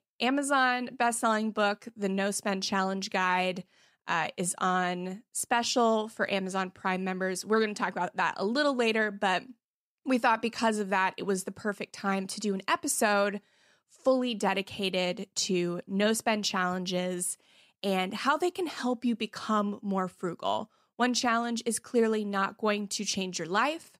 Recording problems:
none

